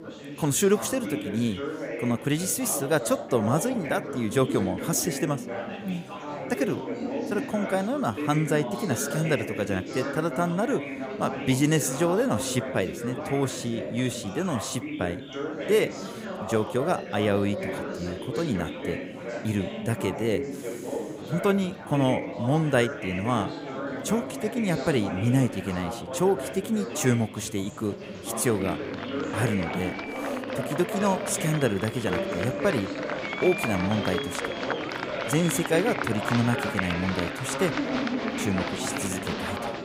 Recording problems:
chatter from many people; loud; throughout; 5 dB below the speech

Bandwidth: 15.5 kHz